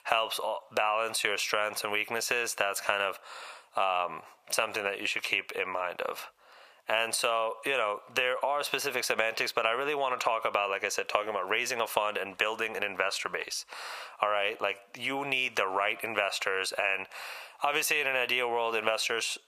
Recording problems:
thin; very; fading below 800 Hz
squashed, flat; heavily

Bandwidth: 15 kHz